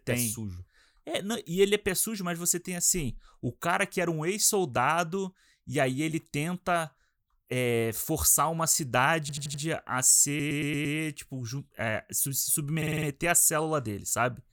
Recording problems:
audio stuttering; at 9 s, at 10 s and at 13 s

